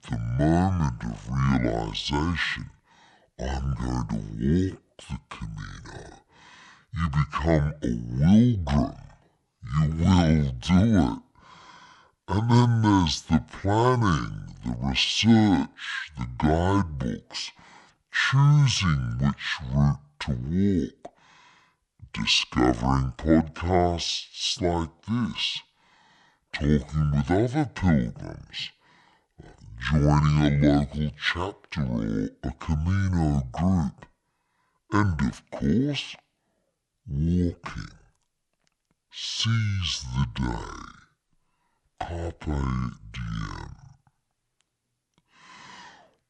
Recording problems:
wrong speed and pitch; too slow and too low; 0.6 times normal speed

